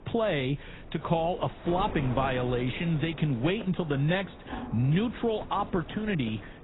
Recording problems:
garbled, watery; badly; nothing above 4 kHz
wind noise on the microphone; occasional gusts; 15 dB below the speech
rain or running water; faint; throughout; 20 dB below the speech

